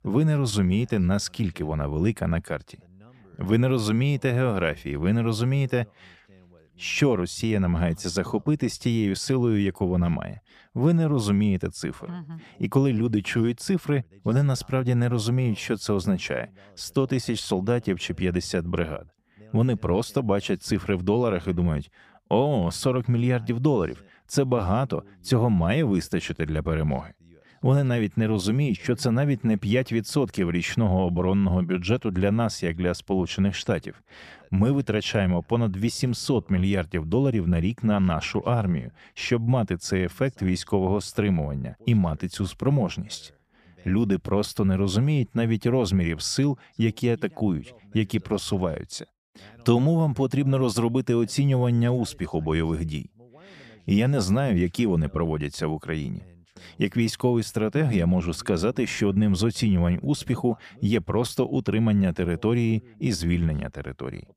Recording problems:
none

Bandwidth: 14.5 kHz